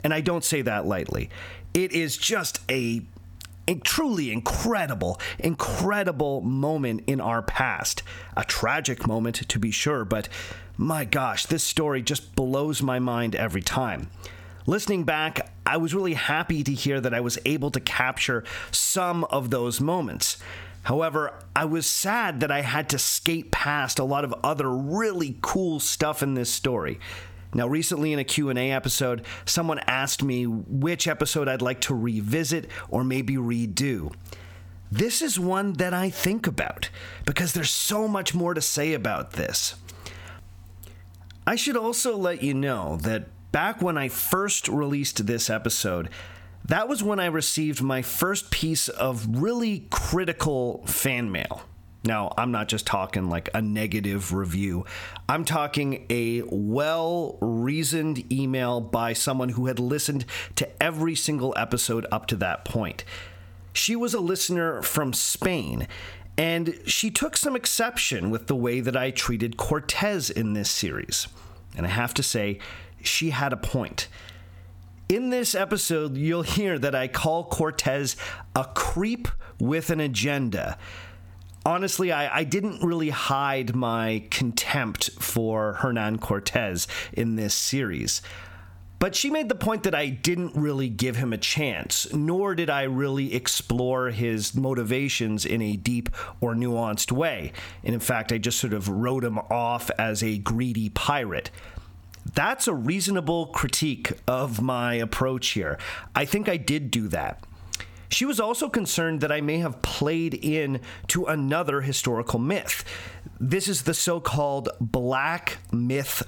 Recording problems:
squashed, flat; heavily

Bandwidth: 17.5 kHz